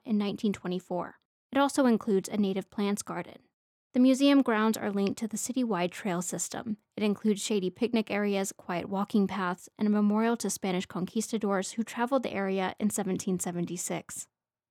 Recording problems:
none

